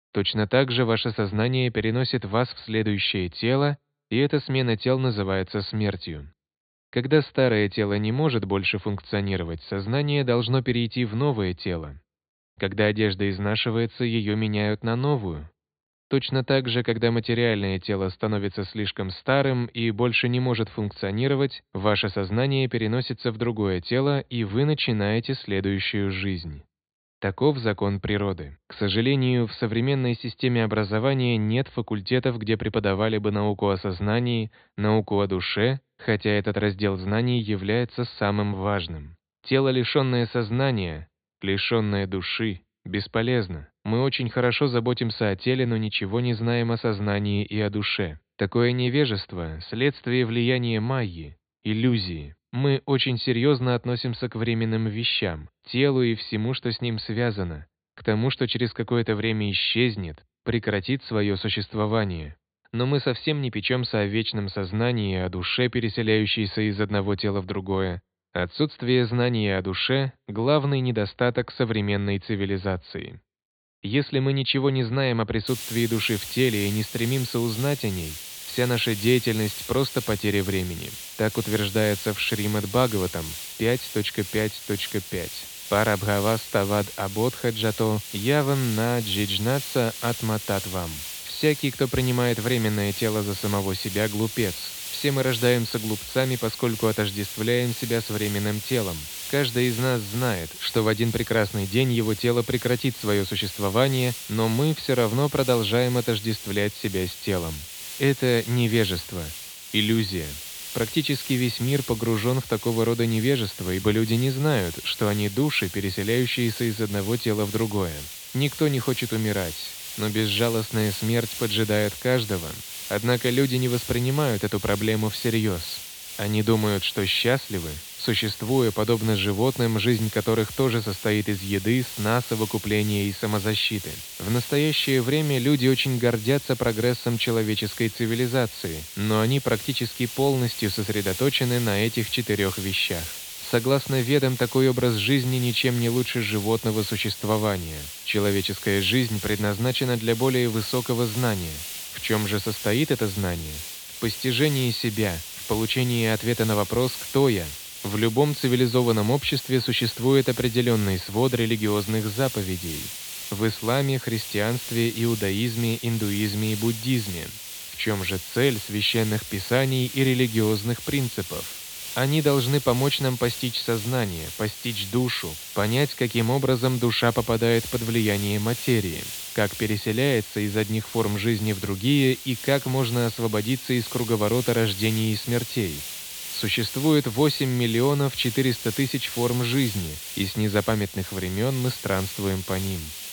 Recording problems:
high frequencies cut off; severe; nothing above 4.5 kHz
hiss; loud; from 1:15 on; 9 dB below the speech

